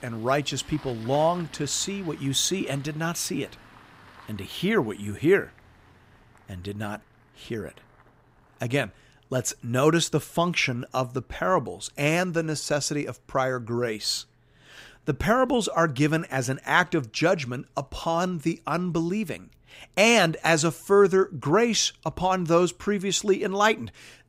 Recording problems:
traffic noise; faint; throughout; 25 dB below the speech

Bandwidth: 15.5 kHz